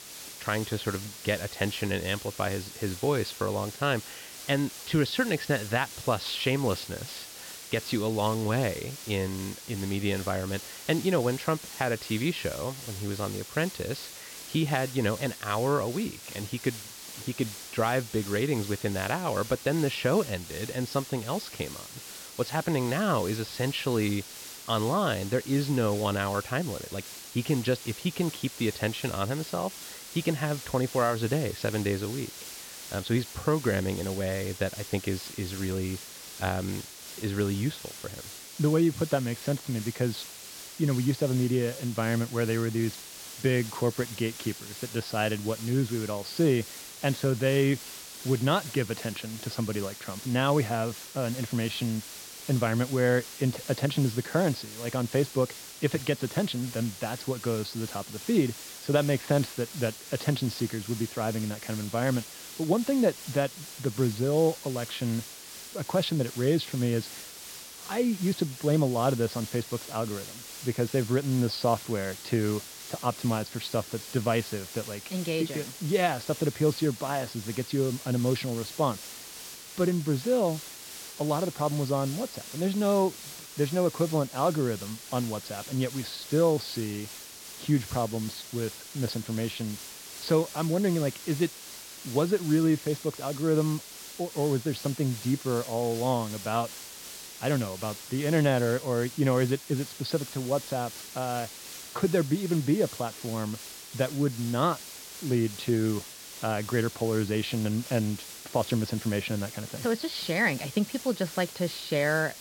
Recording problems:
high frequencies cut off; noticeable; nothing above 5.5 kHz
hiss; noticeable; throughout; 10 dB below the speech

